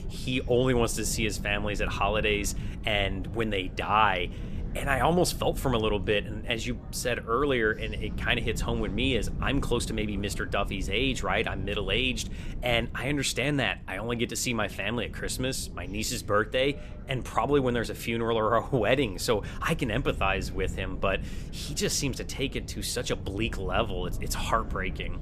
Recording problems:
wind noise on the microphone; occasional gusts; 20 dB below the speech
chatter from many people; faint; throughout; 25 dB below the speech

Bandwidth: 14.5 kHz